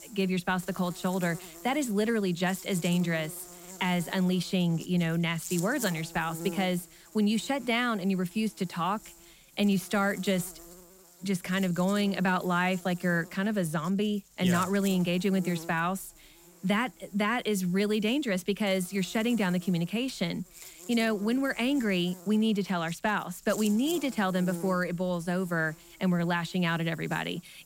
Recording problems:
electrical hum; noticeable; throughout; 50 Hz, 15 dB below the speech

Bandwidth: 16 kHz